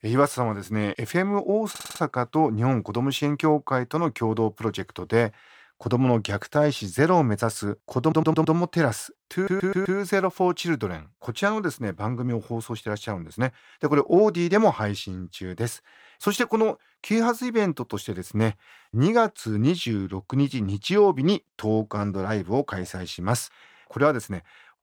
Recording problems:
audio stuttering; at 1.5 s, at 8 s and at 9.5 s

